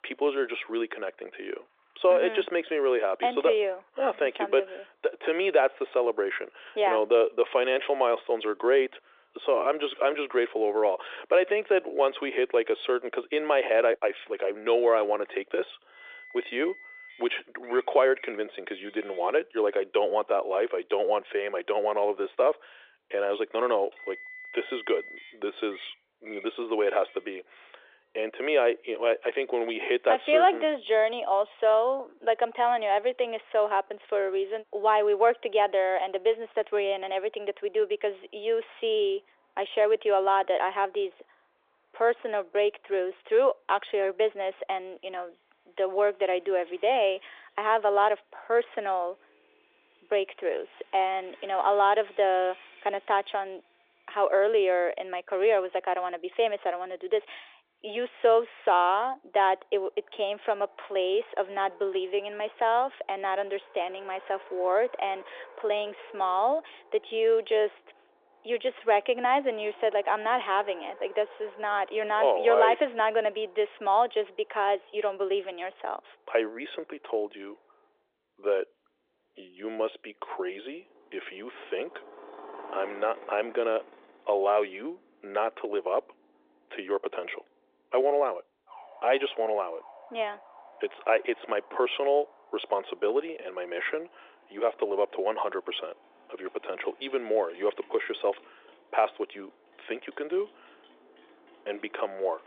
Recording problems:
phone-call audio; nothing above 3.5 kHz
traffic noise; faint; throughout; 25 dB below the speech

